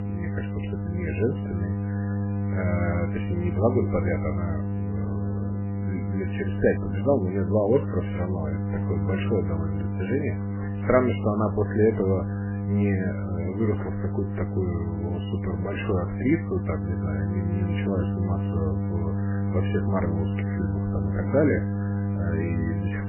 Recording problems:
garbled, watery; badly; nothing above 3 kHz
electrical hum; loud; throughout; 50 Hz, 7 dB below the speech

